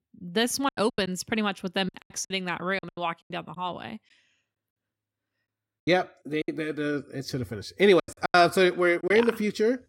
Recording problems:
choppy; very; 12% of the speech affected

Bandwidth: 16.5 kHz